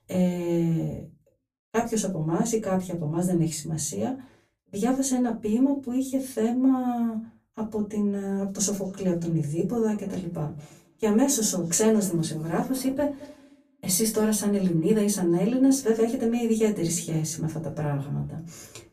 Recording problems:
off-mic speech; far
echo of what is said; faint; from 9 s on; 220 ms later, 20 dB below the speech
room echo; very slight; dies away in 0.2 s

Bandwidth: 14.5 kHz